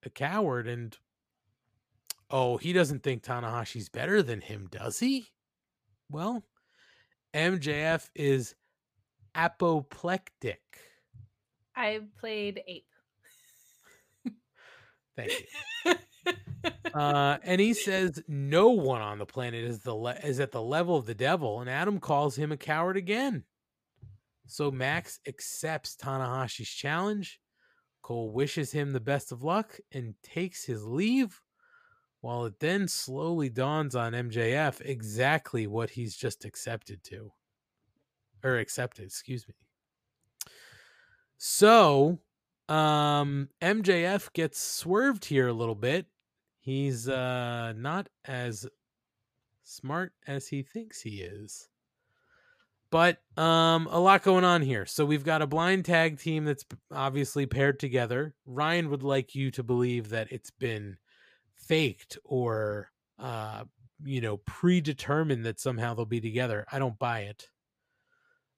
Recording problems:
none

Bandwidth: 15 kHz